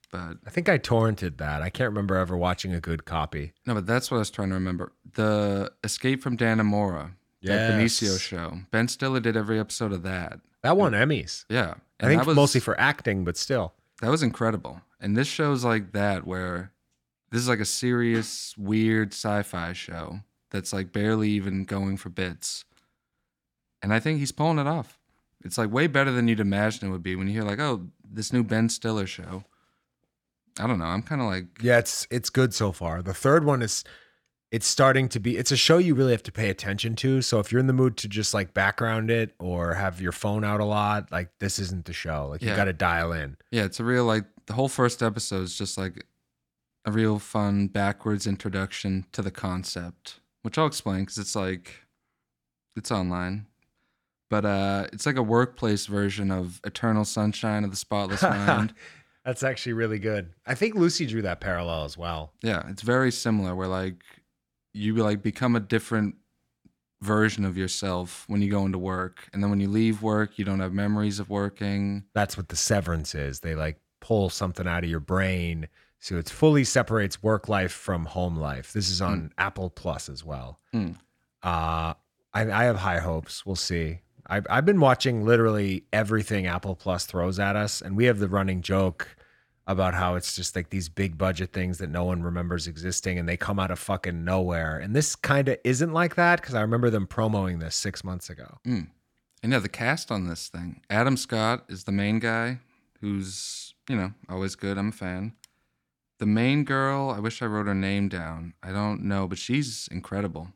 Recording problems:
none

